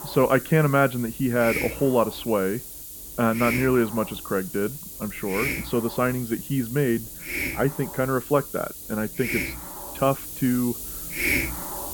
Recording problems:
muffled; very; fading above 2 kHz
hiss; loud; throughout; 6 dB below the speech

